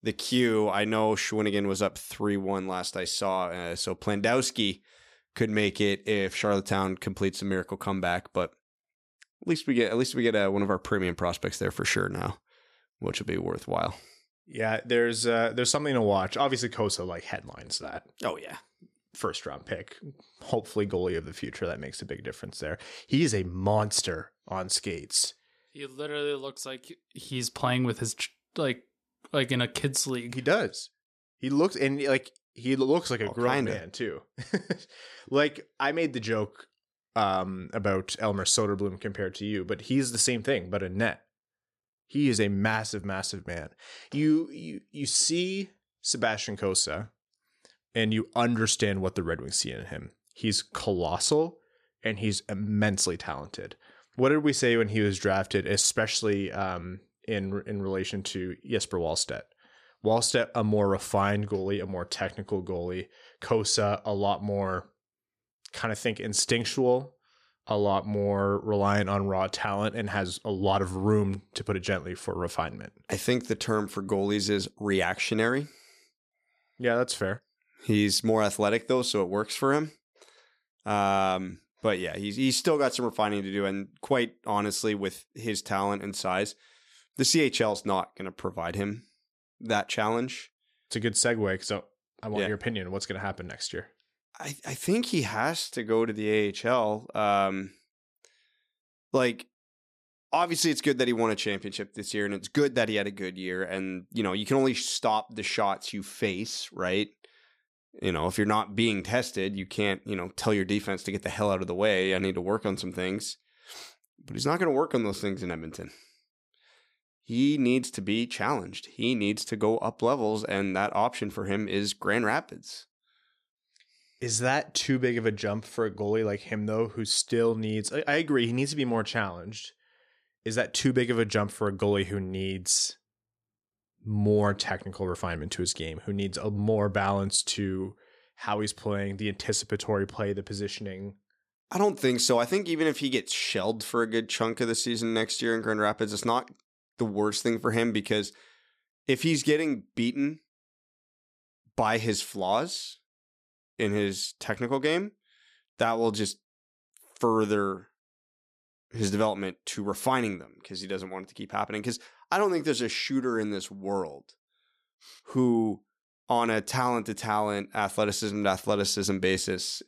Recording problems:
none

